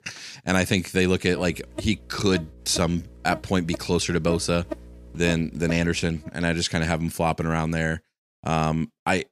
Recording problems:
electrical hum; noticeable; from 1.5 to 6 s; 60 Hz, 15 dB below the speech

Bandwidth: 15 kHz